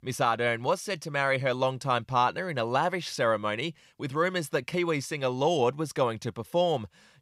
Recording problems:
none

